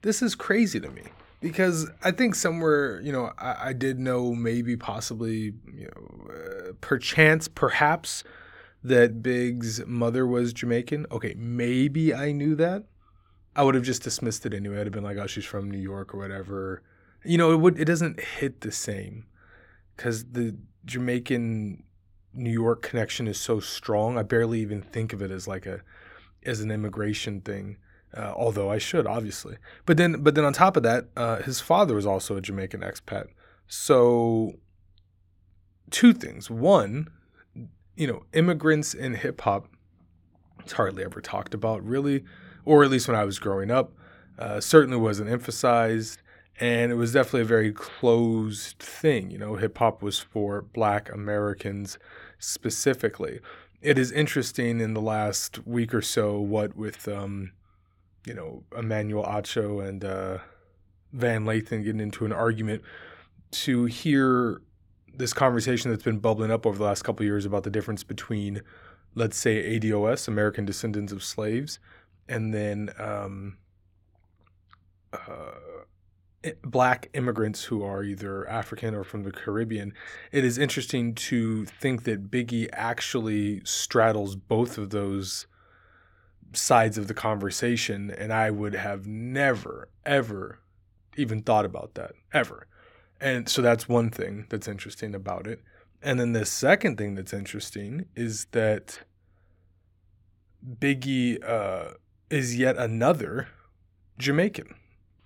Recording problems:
none

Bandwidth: 17 kHz